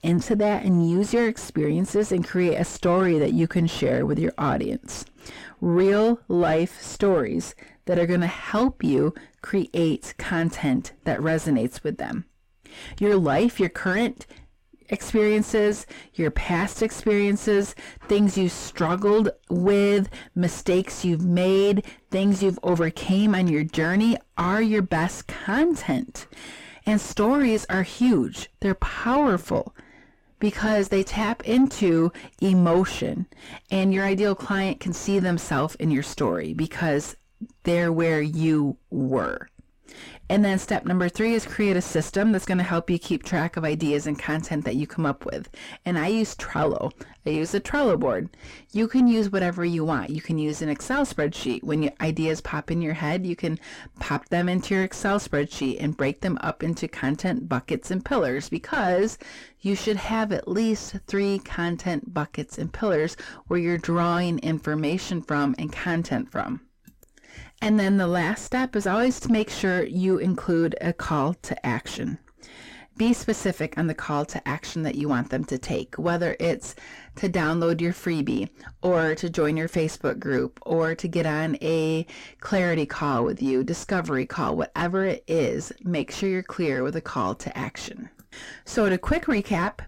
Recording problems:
distortion; heavy; 7 dB below the speech

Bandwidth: 16 kHz